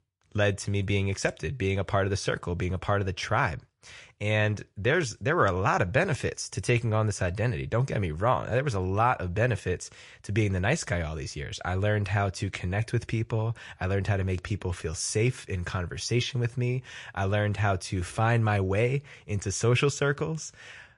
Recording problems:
garbled, watery; slightly; nothing above 9.5 kHz

